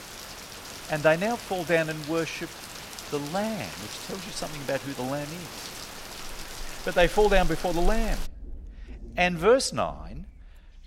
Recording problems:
rain or running water; noticeable; throughout; 10 dB below the speech

